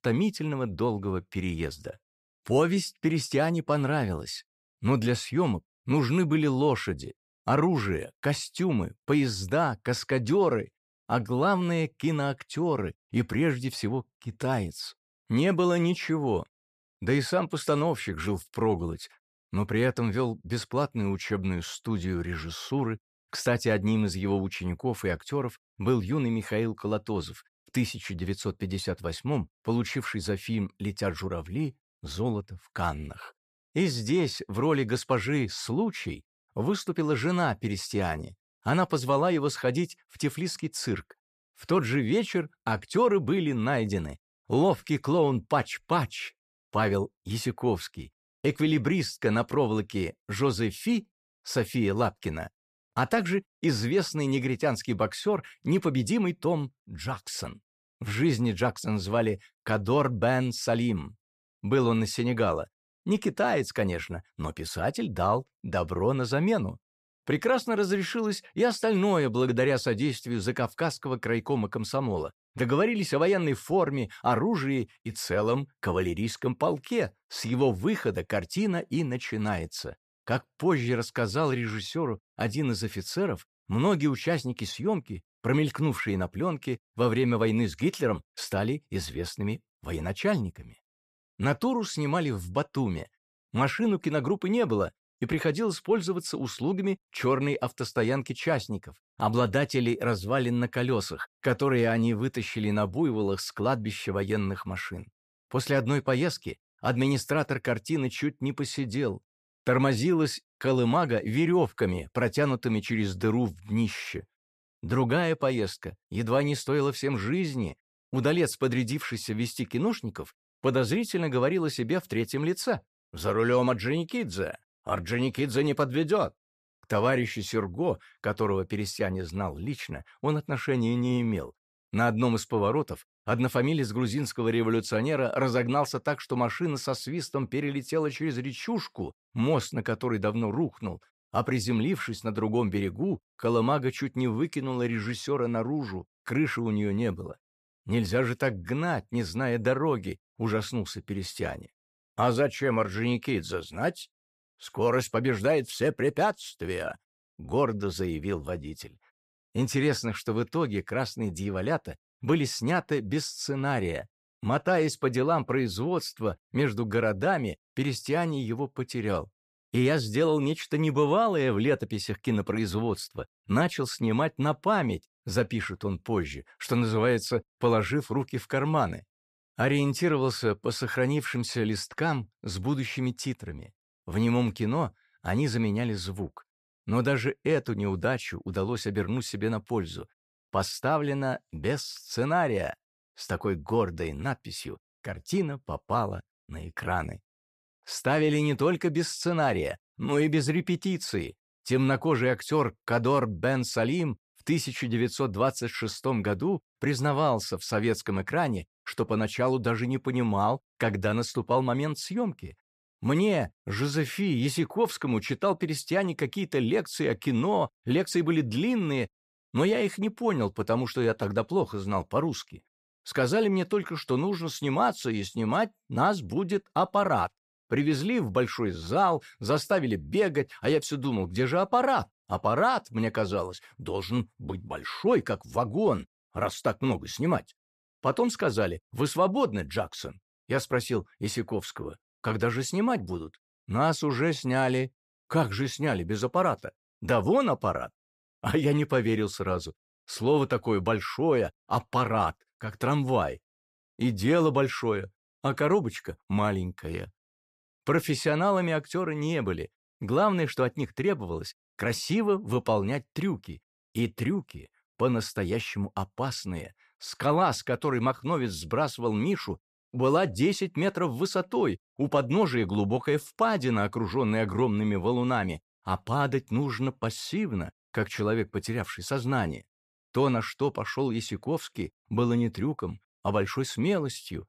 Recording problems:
none

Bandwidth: 14.5 kHz